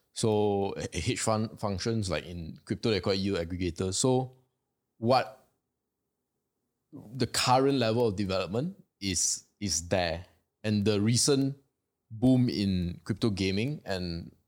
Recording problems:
none

